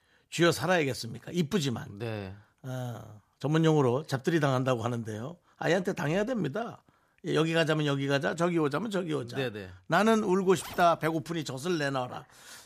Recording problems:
household noises; noticeable; from 10 s on; 20 dB below the speech

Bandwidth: 14.5 kHz